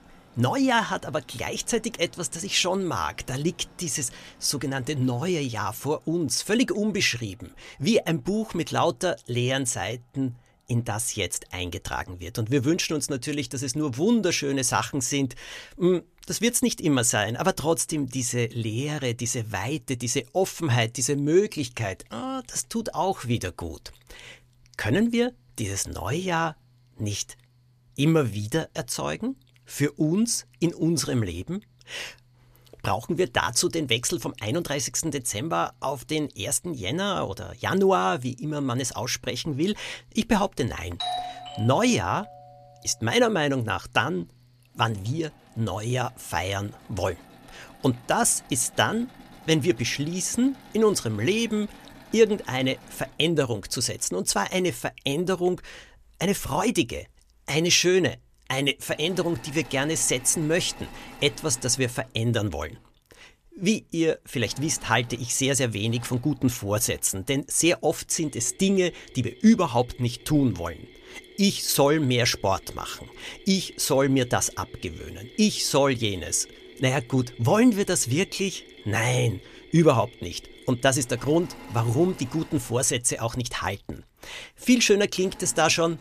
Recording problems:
machinery noise; faint; throughout; 25 dB below the speech
doorbell; noticeable; from 41 to 42 s; peak 5 dB below the speech

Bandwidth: 14.5 kHz